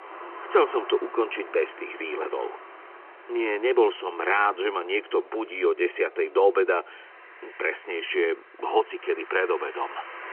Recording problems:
phone-call audio; nothing above 3 kHz
traffic noise; noticeable; throughout; 20 dB below the speech

